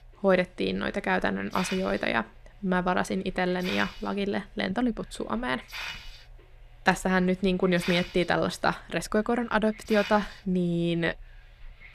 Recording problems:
hiss; noticeable; throughout; 10 dB below the speech

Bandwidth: 14.5 kHz